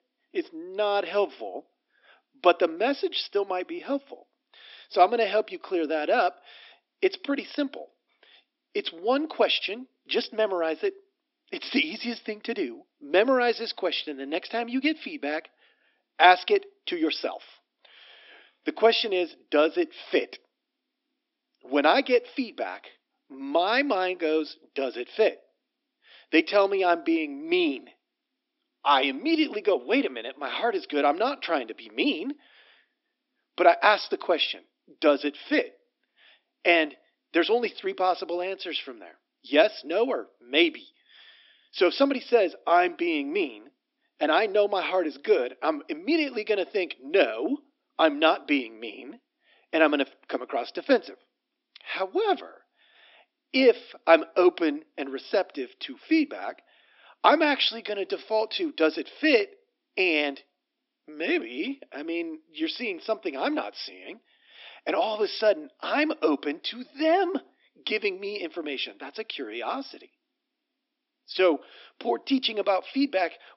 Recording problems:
thin; somewhat; fading below 250 Hz
high frequencies cut off; noticeable; nothing above 5.5 kHz

